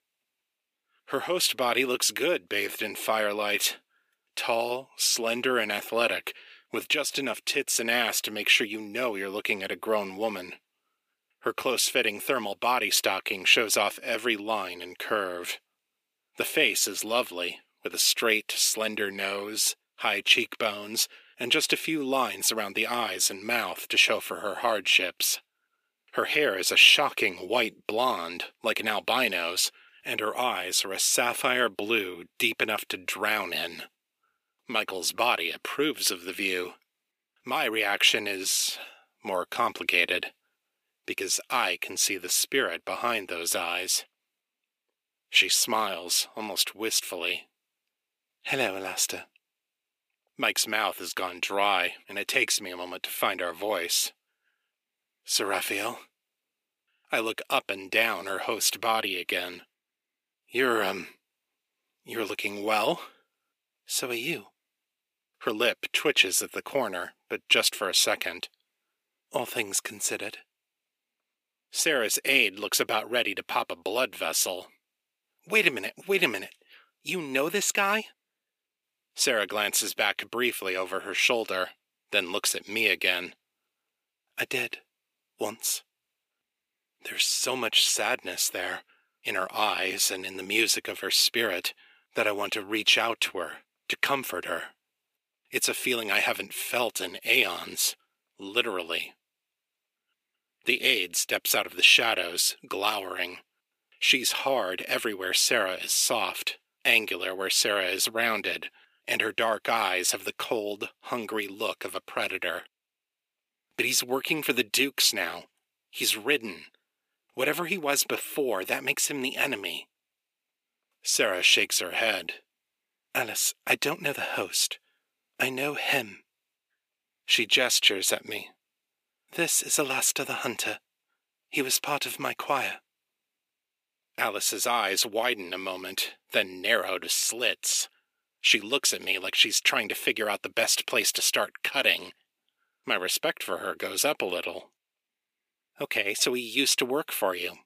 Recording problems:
thin; somewhat; fading below 350 Hz

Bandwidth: 15 kHz